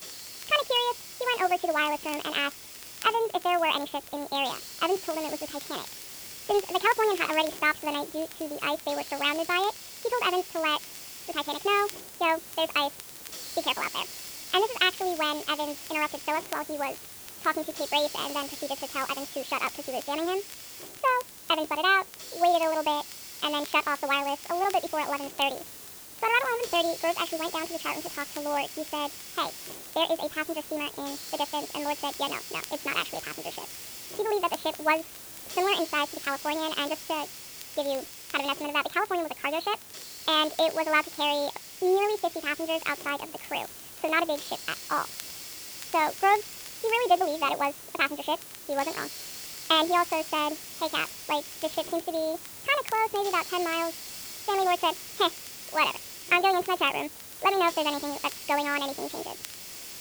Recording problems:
high frequencies cut off; severe; nothing above 4.5 kHz
wrong speed and pitch; too fast and too high; 1.6 times normal speed
hiss; noticeable; throughout; 10 dB below the speech
crackle, like an old record; faint; 25 dB below the speech

